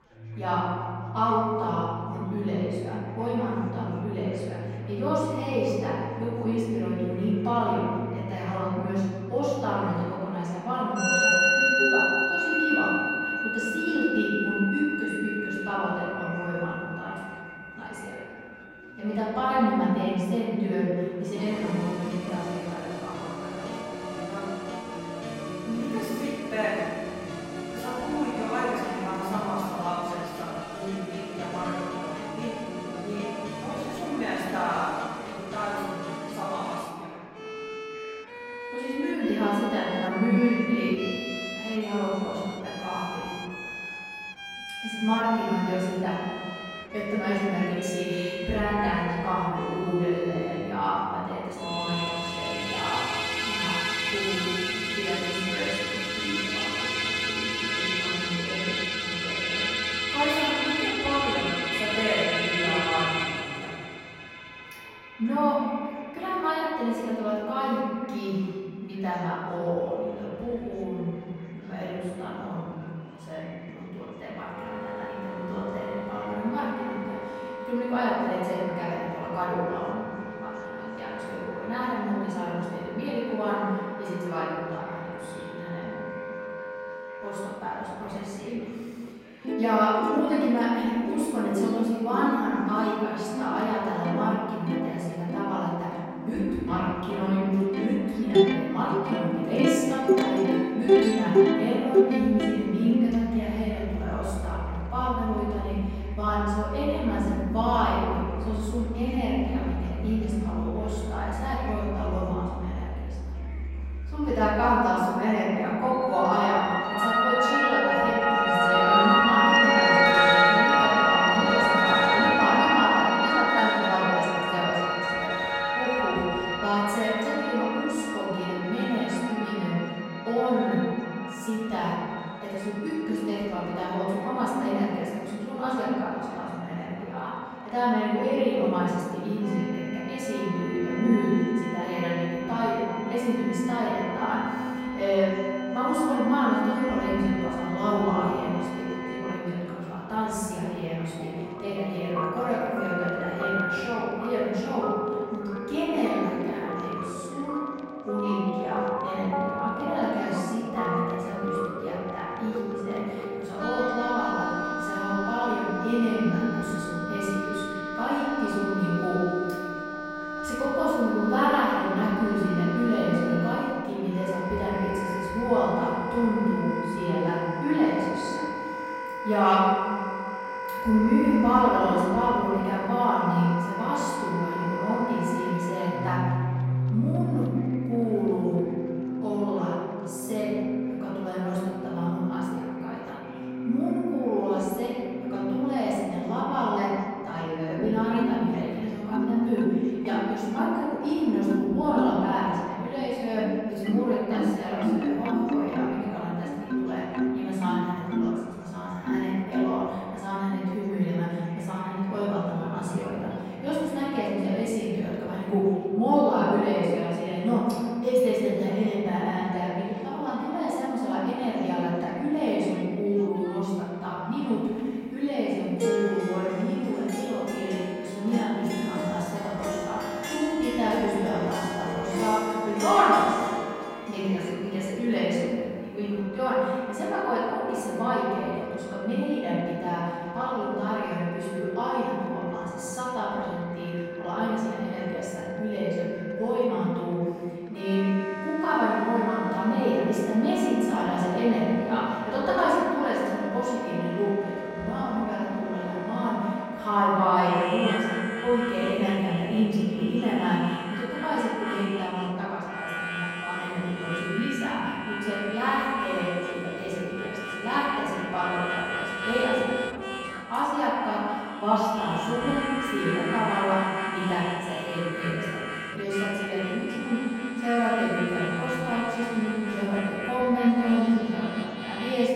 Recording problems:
room echo; strong; dies away in 2.1 s
off-mic speech; far
background music; loud; throughout; 2 dB below the speech
chatter from many people; faint; throughout; 25 dB below the speech

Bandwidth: 16 kHz